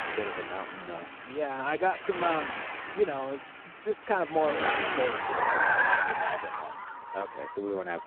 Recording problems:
phone-call audio; poor line
traffic noise; very loud; throughout; 3 dB above the speech

